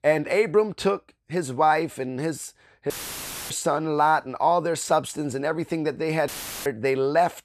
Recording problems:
audio cutting out; filled with static; at 3 s for 0.5 s and at 6.5 s

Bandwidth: 14 kHz